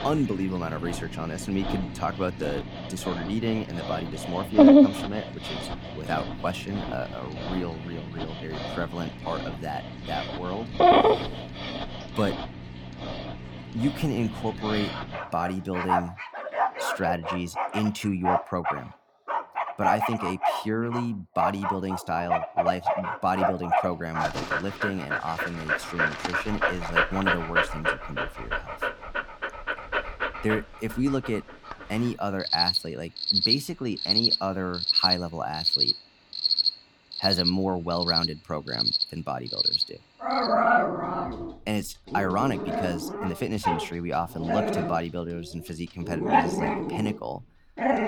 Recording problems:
animal sounds; very loud; throughout; 4 dB above the speech

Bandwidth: 19 kHz